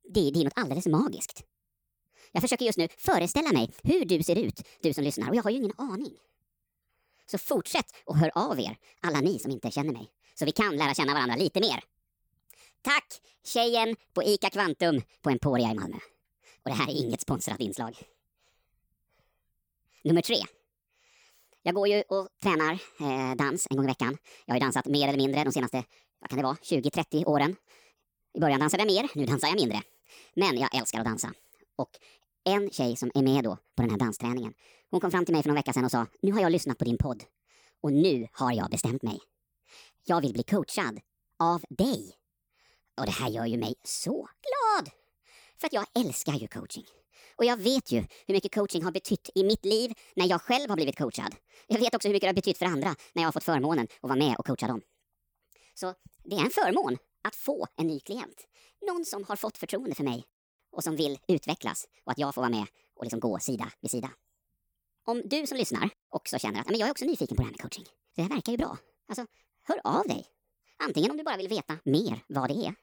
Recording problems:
wrong speed and pitch; too fast and too high; 1.5 times normal speed

